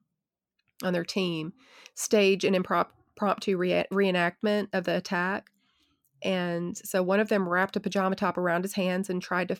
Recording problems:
none

